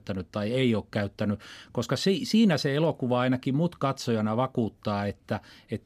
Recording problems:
none

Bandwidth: 15 kHz